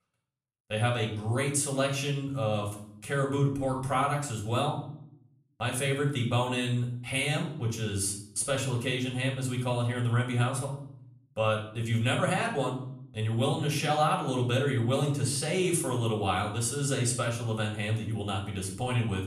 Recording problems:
off-mic speech; far
room echo; slight; dies away in 0.6 s

